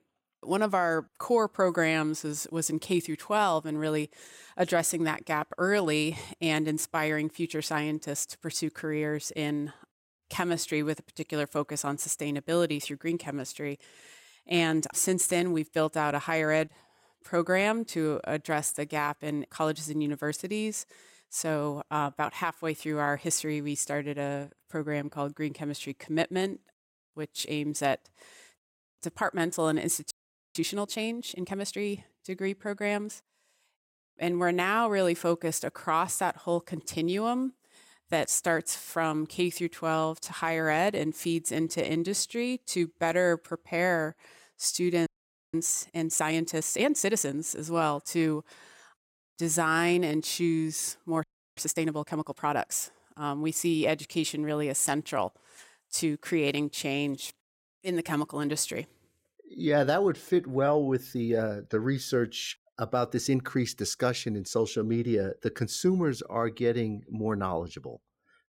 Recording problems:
audio freezing; at 30 s, at 45 s and at 51 s

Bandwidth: 16 kHz